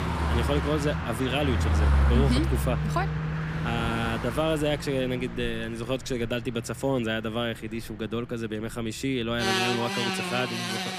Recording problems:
traffic noise; very loud; throughout; 1 dB above the speech

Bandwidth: 15 kHz